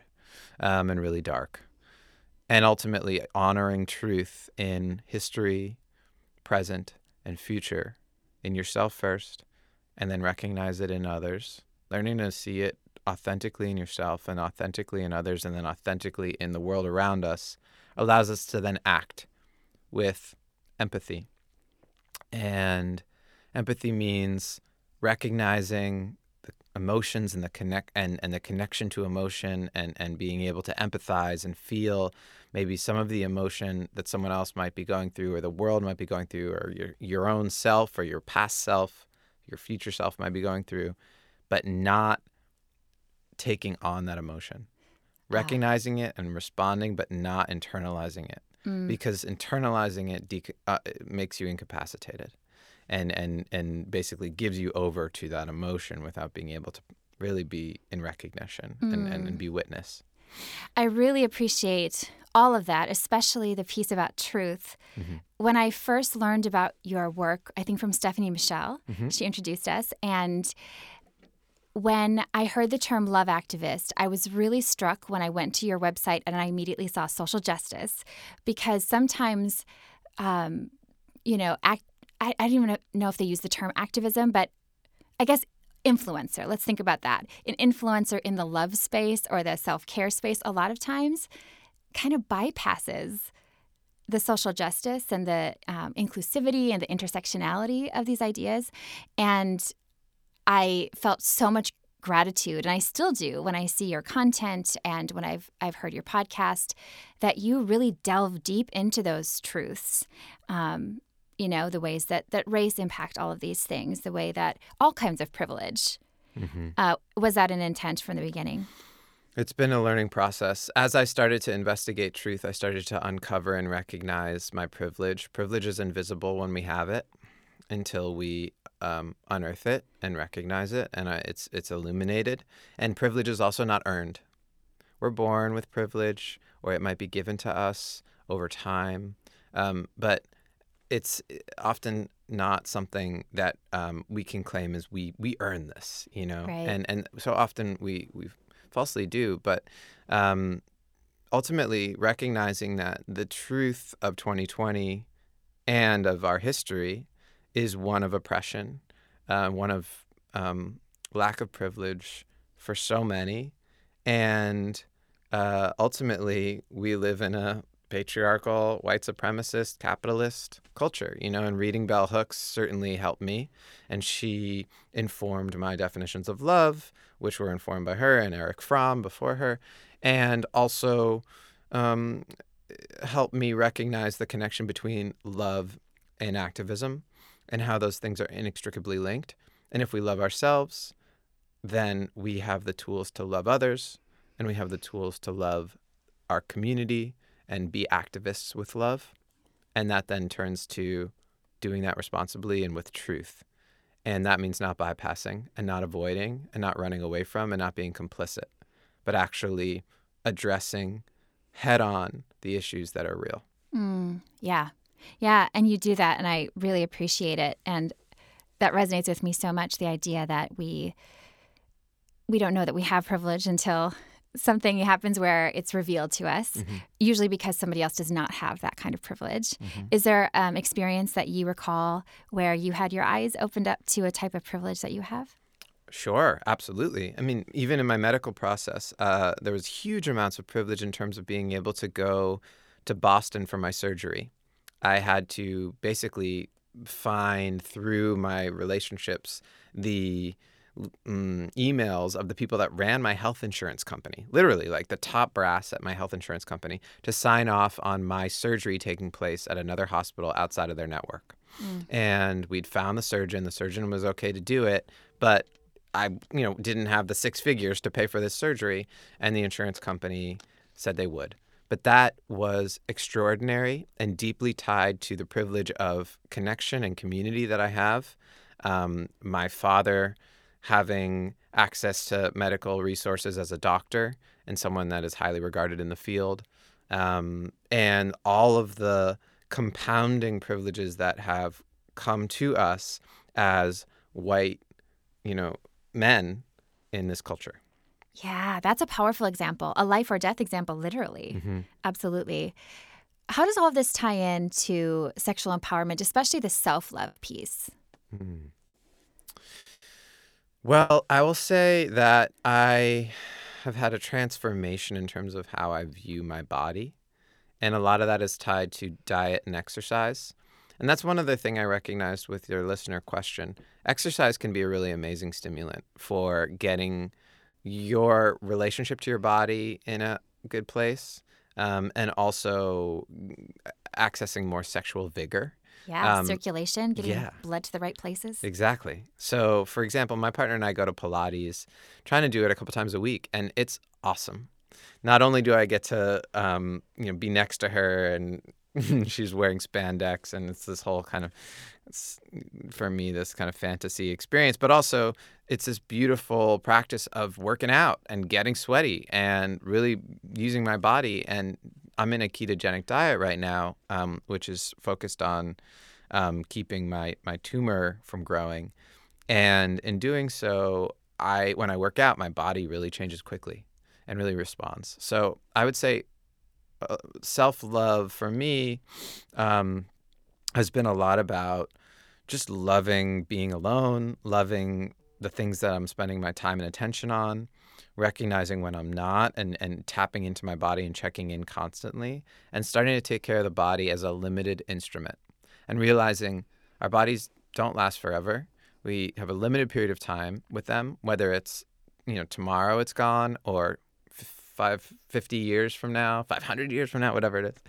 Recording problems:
choppy; very; from 5:07 to 5:11; 6% of the speech affected

